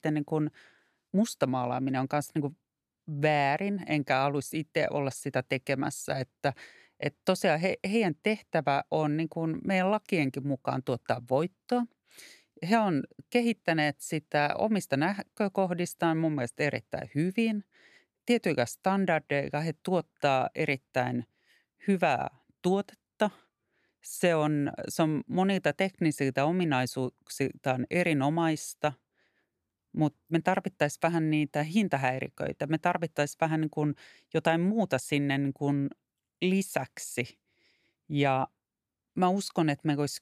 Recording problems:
none

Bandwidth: 14.5 kHz